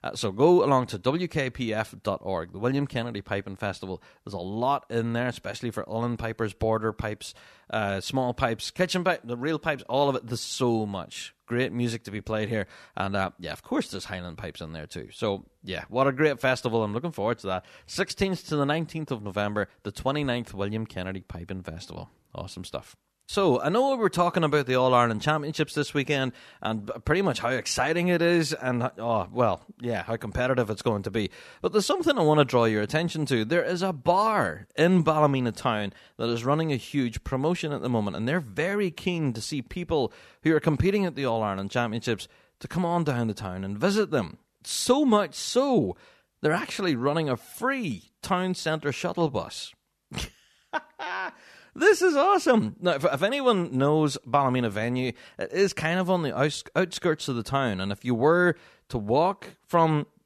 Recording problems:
none

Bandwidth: 13.5 kHz